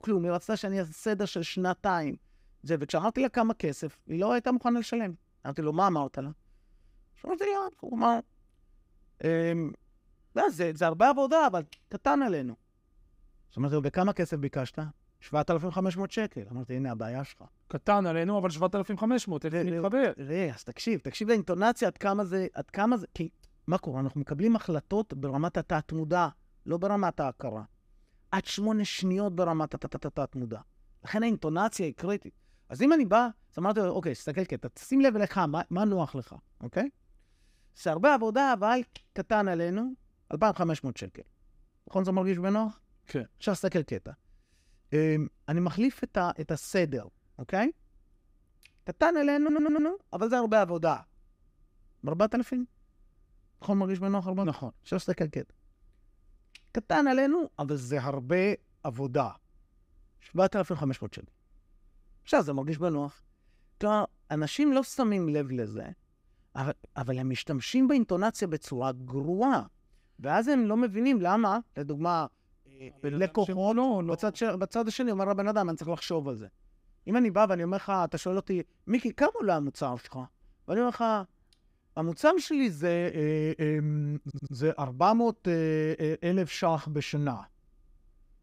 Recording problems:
audio stuttering; at 30 s, at 49 s and at 1:24

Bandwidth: 15.5 kHz